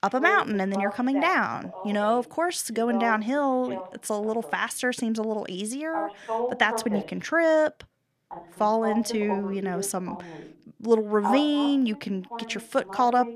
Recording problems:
voice in the background; loud; throughout; 9 dB below the speech

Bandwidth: 14.5 kHz